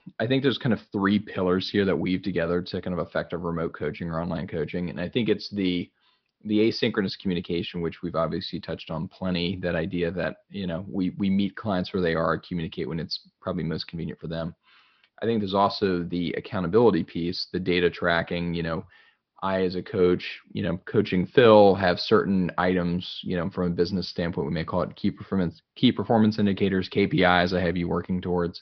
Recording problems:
high frequencies cut off; noticeable; nothing above 5.5 kHz

